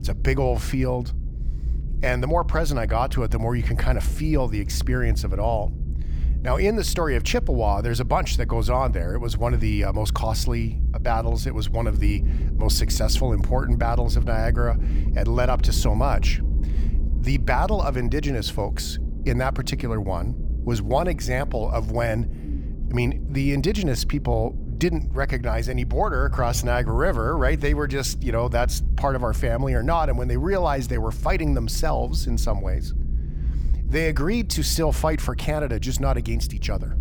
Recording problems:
low rumble; noticeable; throughout; 15 dB below the speech

